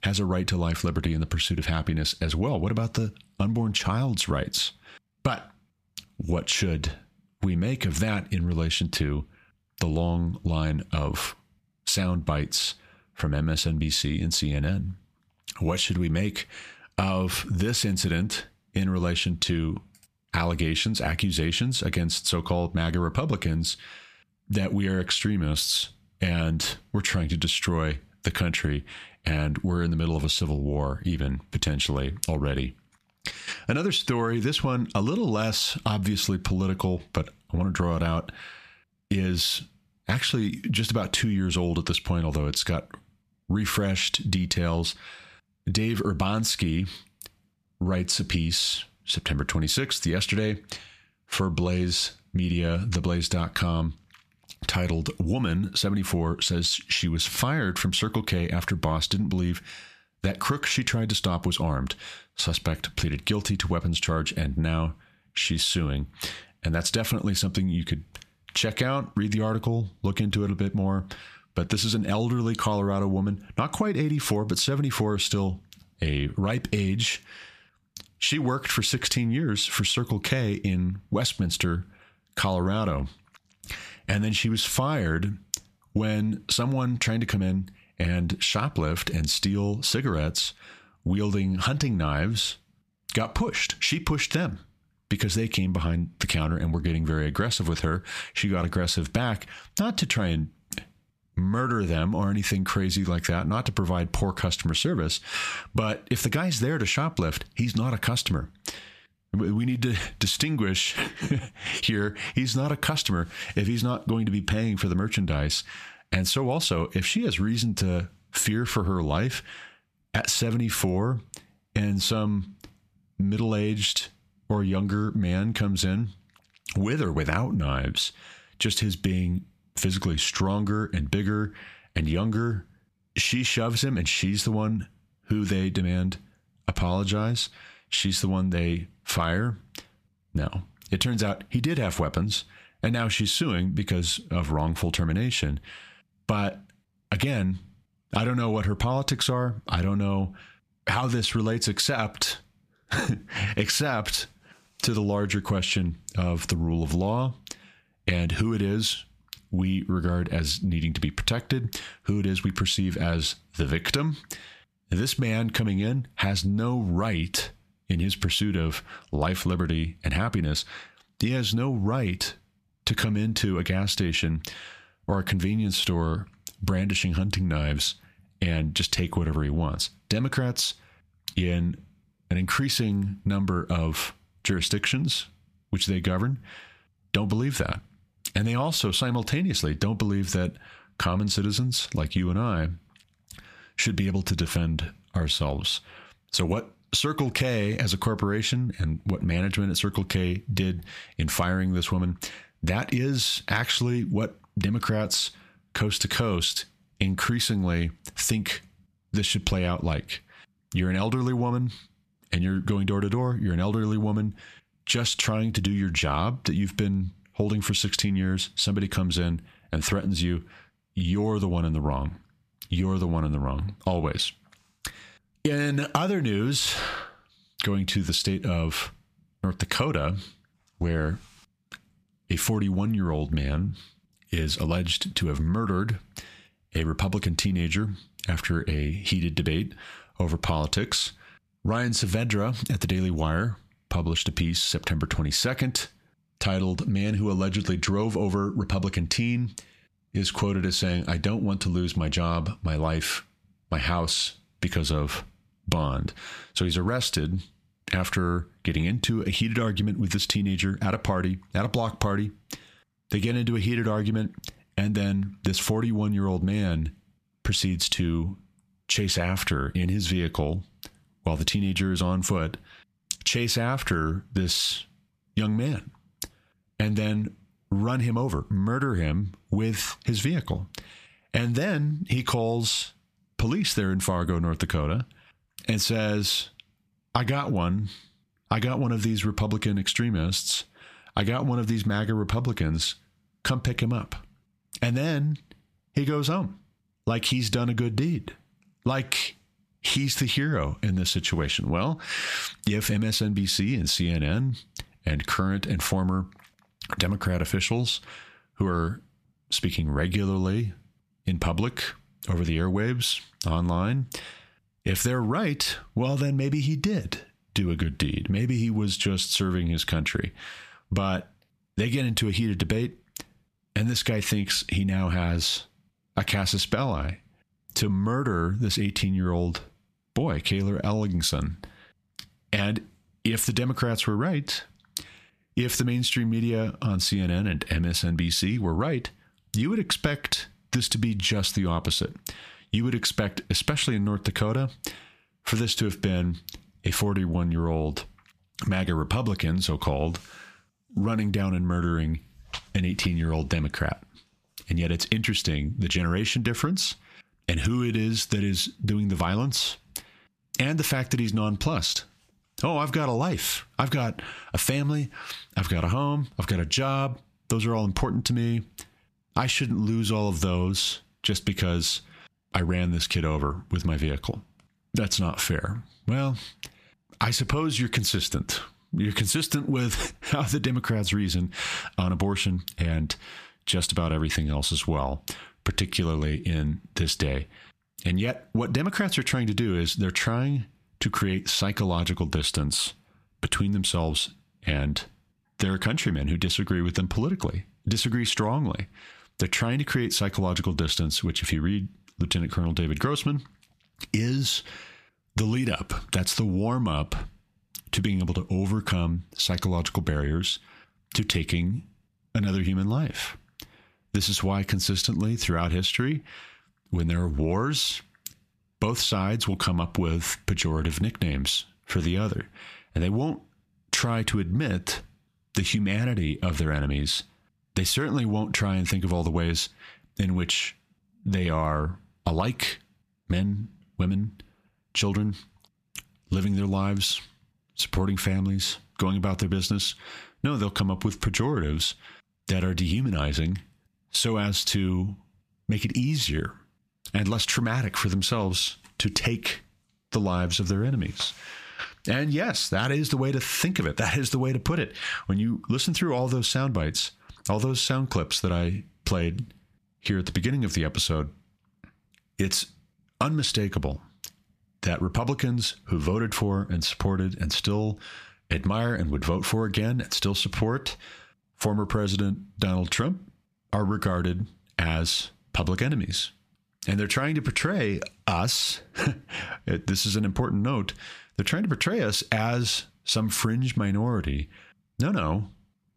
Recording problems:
squashed, flat; heavily

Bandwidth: 14.5 kHz